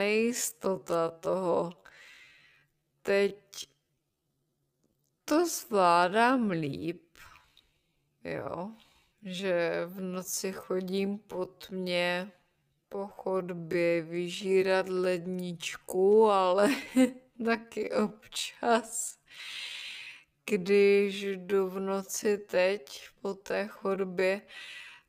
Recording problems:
wrong speed, natural pitch; too slow; 0.5 times normal speed
abrupt cut into speech; at the start

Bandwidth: 15 kHz